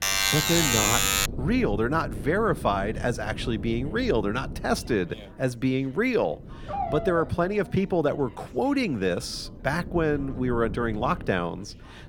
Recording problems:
wind noise on the microphone; occasional gusts; 20 dB below the speech
background chatter; faint; throughout; 2 voices, 30 dB below the speech
alarm; loud; until 1.5 s; peak 6 dB above the speech
dog barking; noticeable; from 6.5 to 7.5 s; peak 4 dB below the speech

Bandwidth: 17 kHz